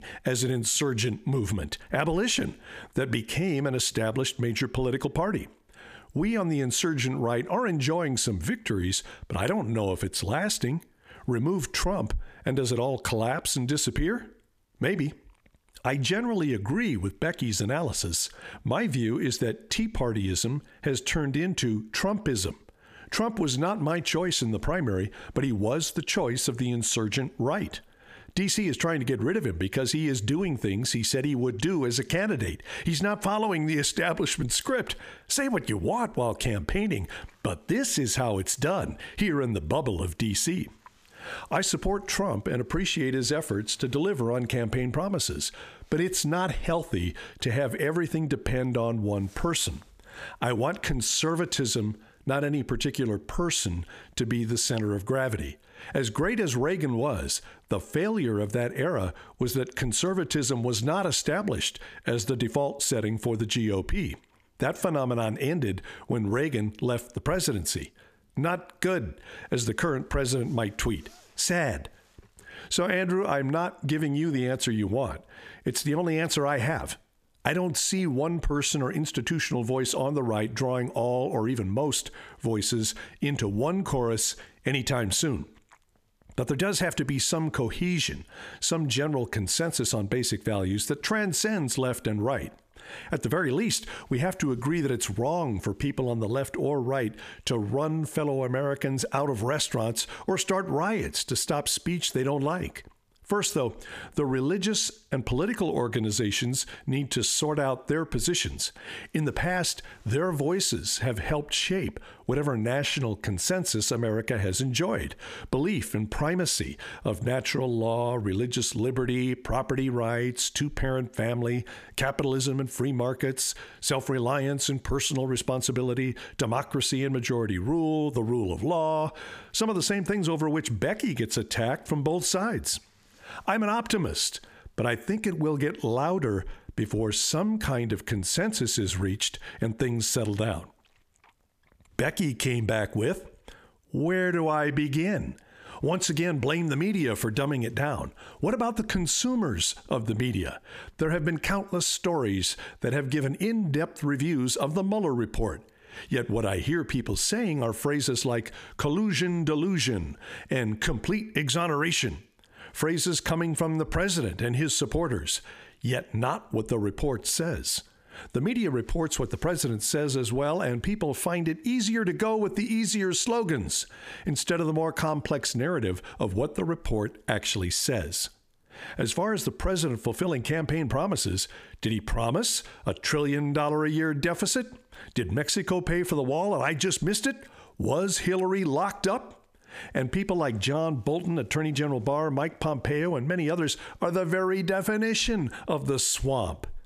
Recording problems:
squashed, flat; heavily

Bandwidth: 14.5 kHz